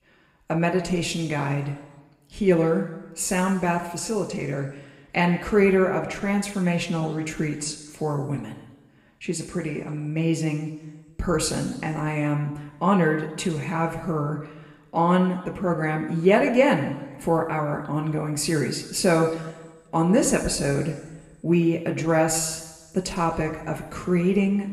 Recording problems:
room echo; slight; dies away in 1.1 s
off-mic speech; somewhat distant

